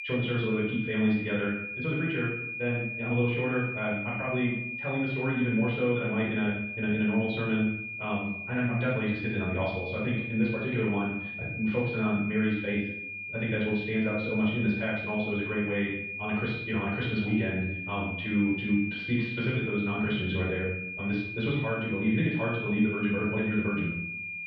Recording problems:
off-mic speech; far
muffled; very; fading above 3.5 kHz
wrong speed, natural pitch; too fast; 1.5 times normal speed
room echo; noticeable; dies away in 0.6 s
high-pitched whine; loud; throughout; 2.5 kHz, 5 dB below the speech

